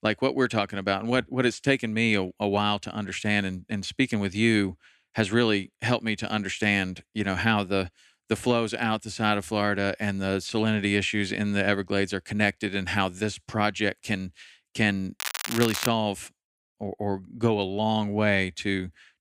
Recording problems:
crackling; loud; at 15 s; 5 dB below the speech

